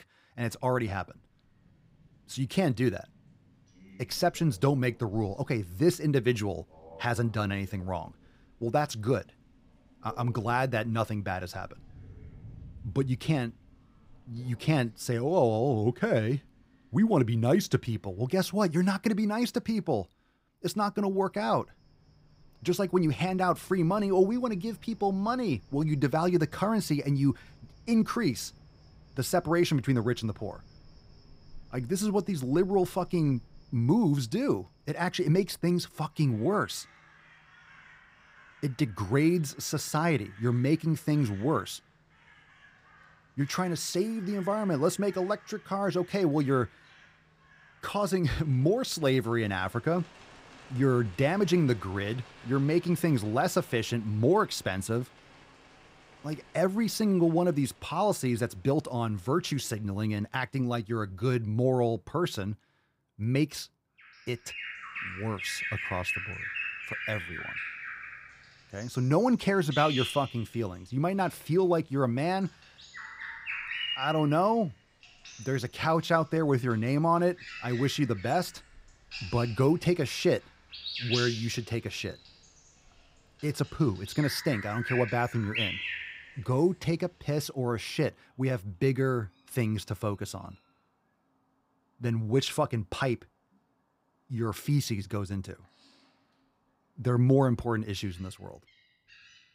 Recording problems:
animal sounds; noticeable; throughout; 10 dB below the speech

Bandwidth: 15.5 kHz